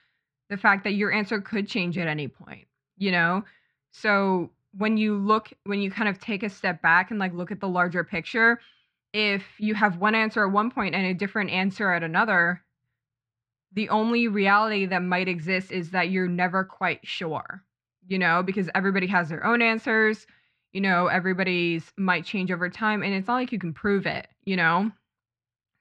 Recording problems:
muffled; slightly; fading above 3.5 kHz

